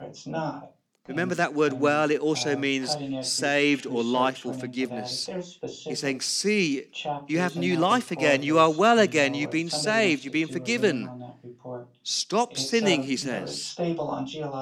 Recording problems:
voice in the background; noticeable; throughout; 10 dB below the speech

